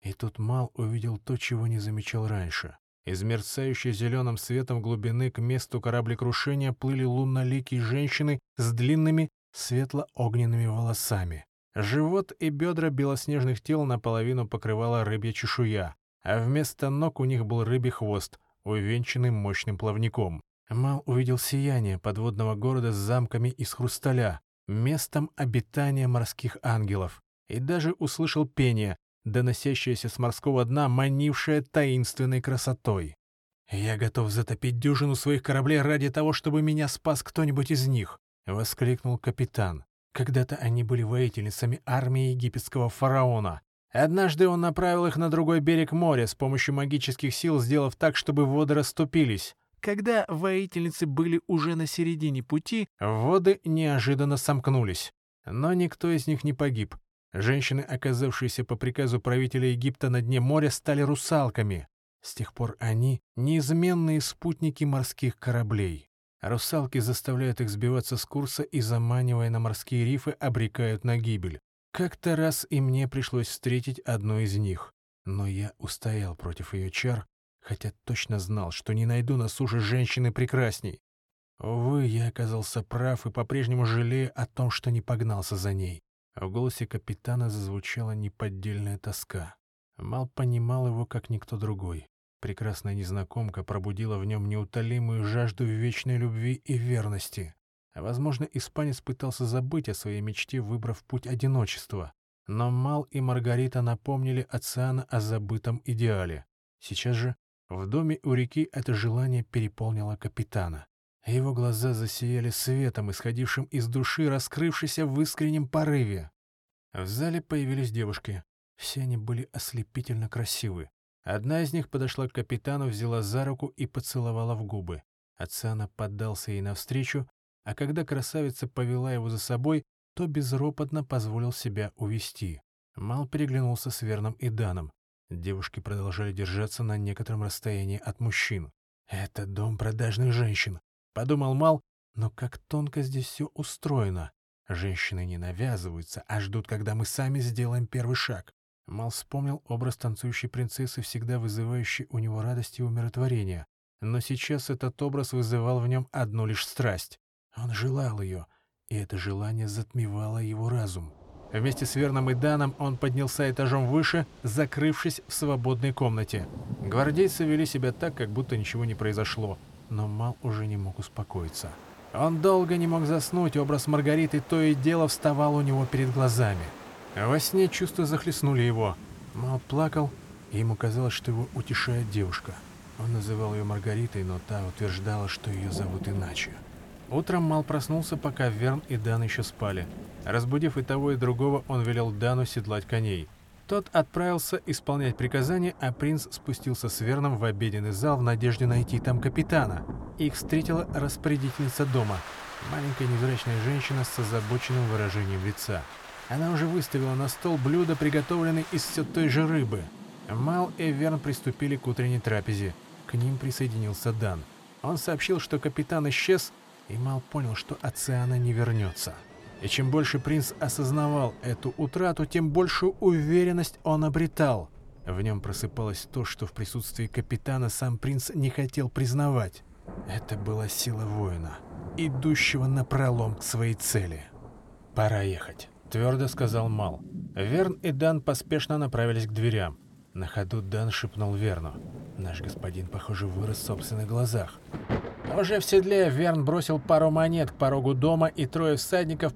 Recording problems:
rain or running water; noticeable; from 2:41 on; 15 dB below the speech

